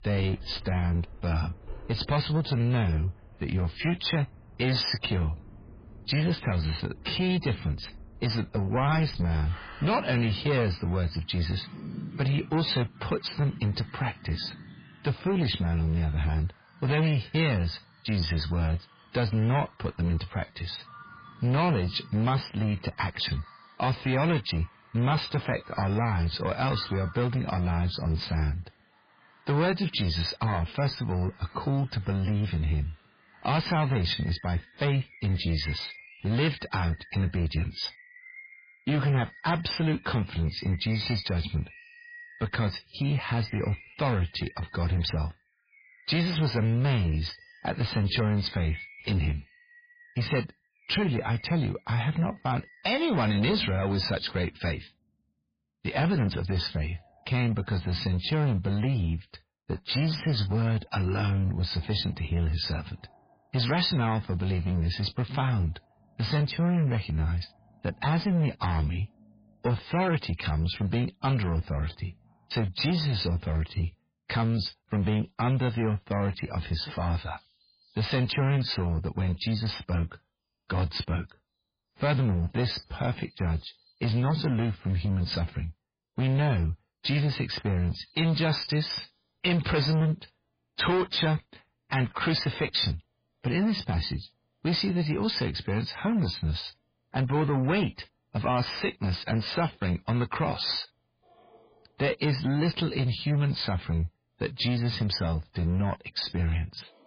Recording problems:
garbled, watery; badly; nothing above 5 kHz
distortion; slight; 13% of the sound clipped
animal sounds; faint; throughout; 20 dB below the speech

